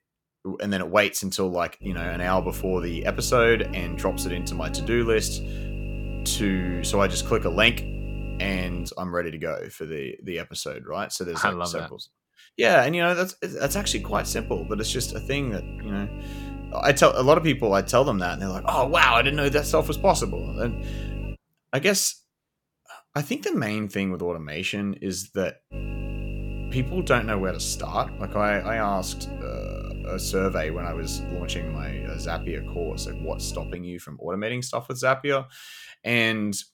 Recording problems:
electrical hum; noticeable; from 2 to 9 s, from 14 to 21 s and from 26 to 34 s; 50 Hz, 15 dB below the speech

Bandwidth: 17.5 kHz